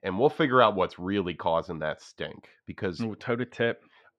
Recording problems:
muffled; slightly; fading above 2.5 kHz

